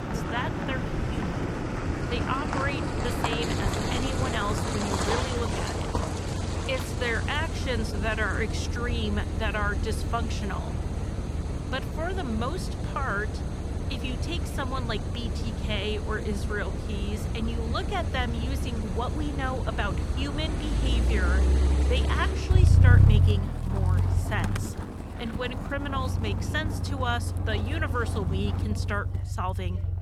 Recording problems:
traffic noise; very loud; throughout; 5 dB above the speech
background chatter; faint; throughout; 4 voices, 20 dB below the speech

